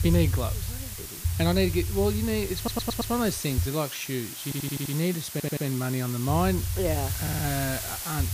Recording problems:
hiss; loud; throughout; 6 dB below the speech
low rumble; noticeable; until 3.5 s and from 6.5 s on; 20 dB below the speech
audio stuttering; 4 times, first at 2.5 s

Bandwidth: 15 kHz